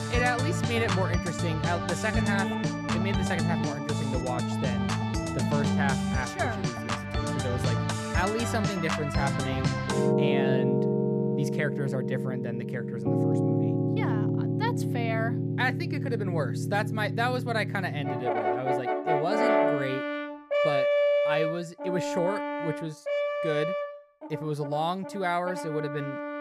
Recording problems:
background music; very loud; throughout; 4 dB above the speech

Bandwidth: 14.5 kHz